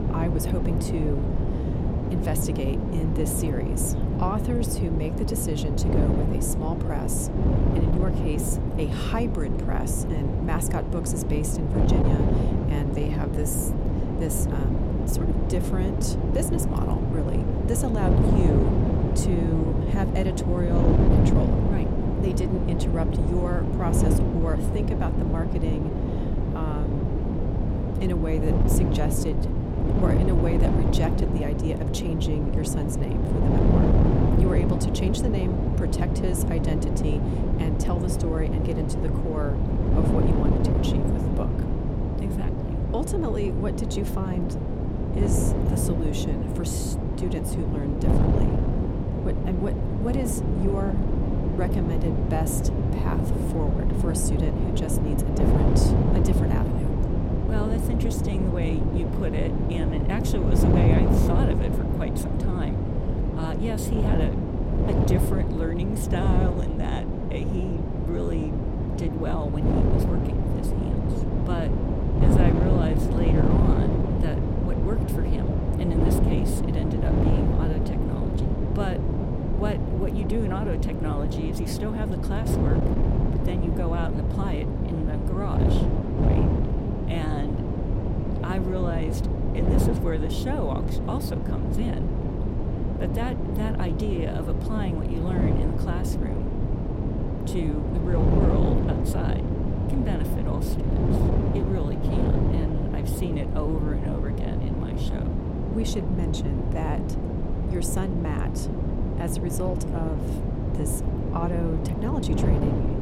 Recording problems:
wind noise on the microphone; heavy; 2 dB above the speech

